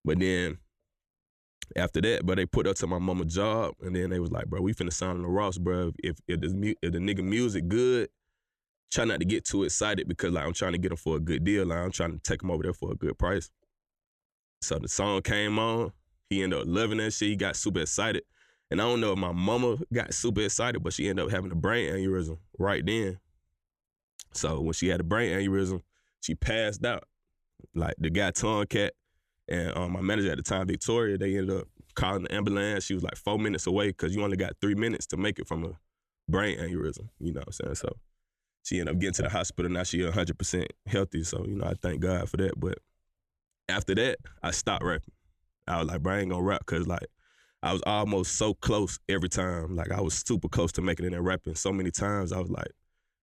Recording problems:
none

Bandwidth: 14 kHz